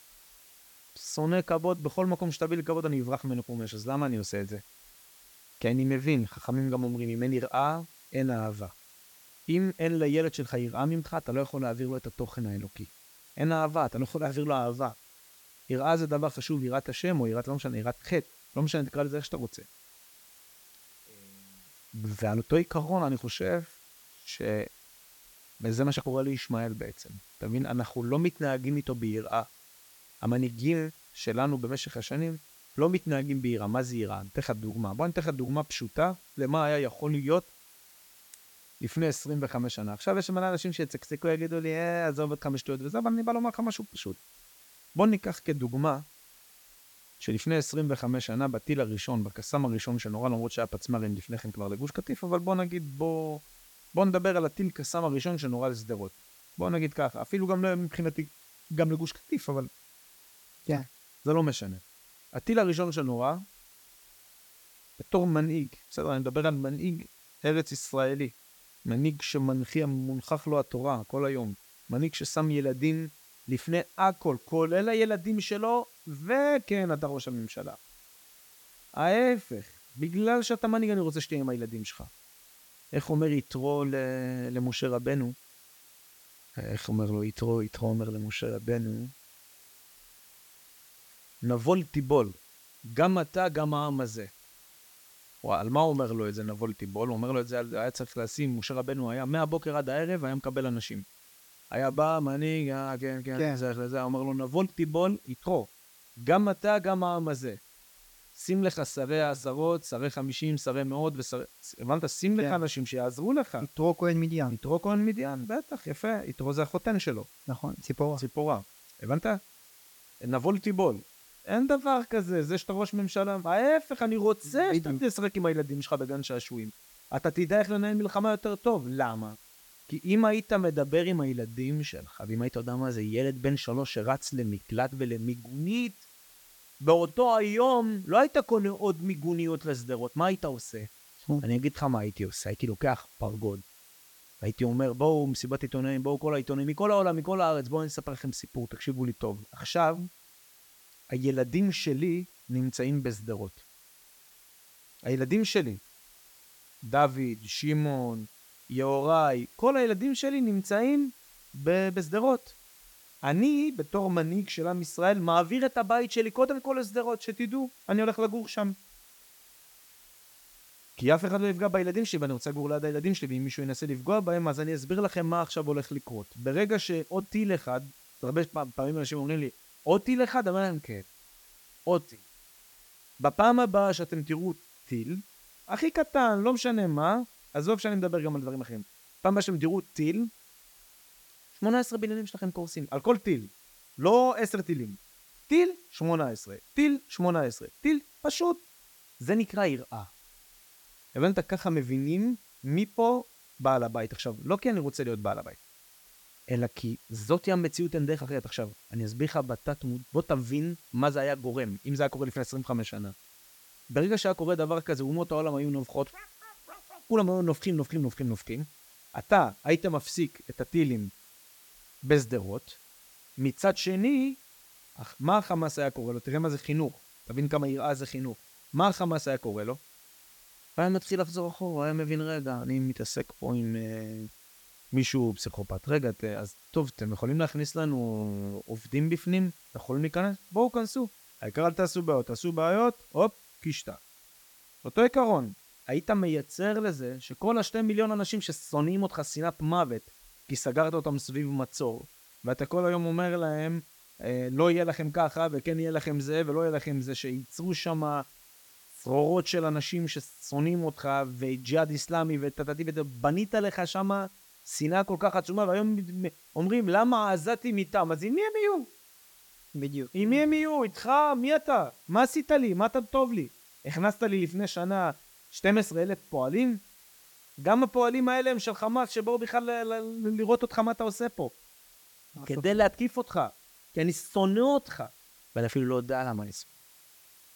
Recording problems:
hiss; faint; throughout; 25 dB below the speech

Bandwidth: 18 kHz